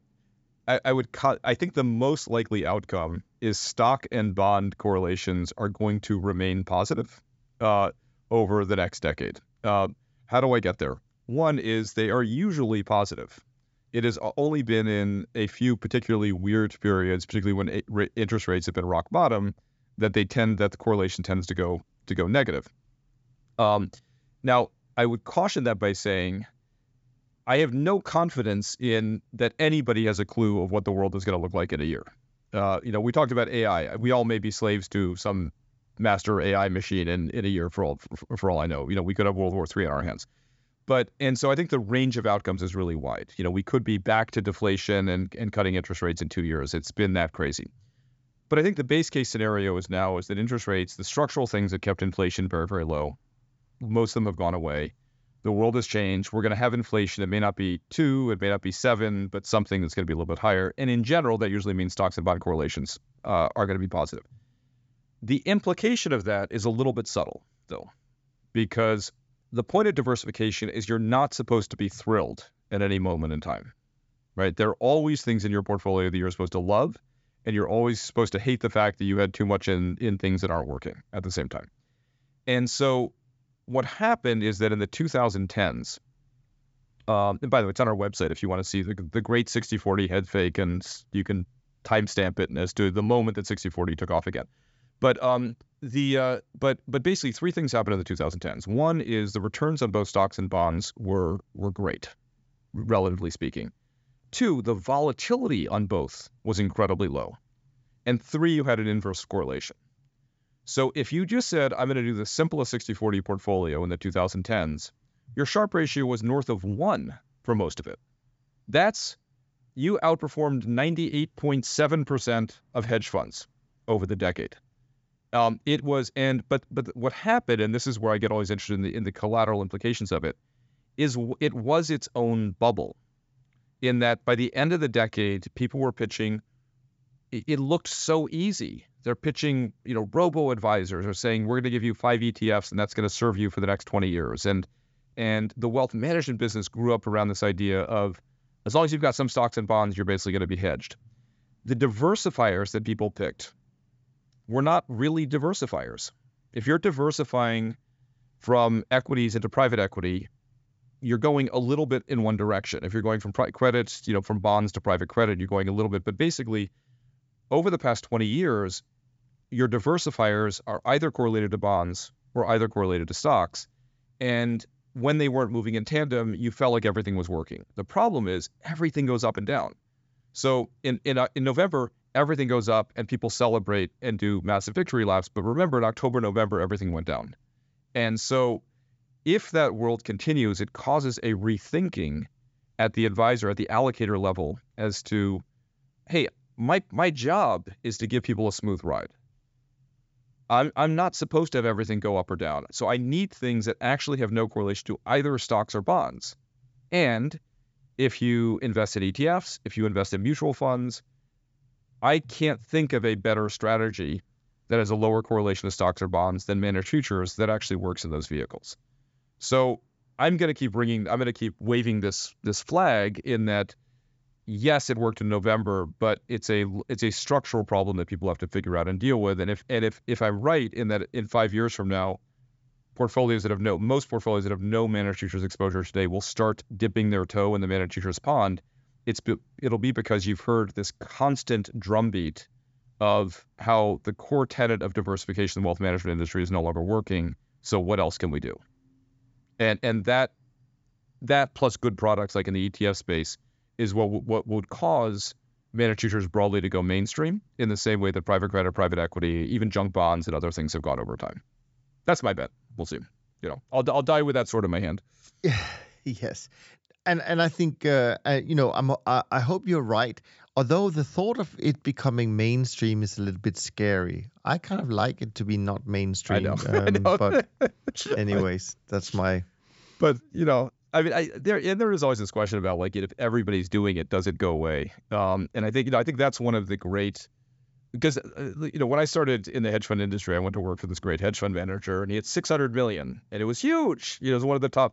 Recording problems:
high frequencies cut off; noticeable; nothing above 8 kHz

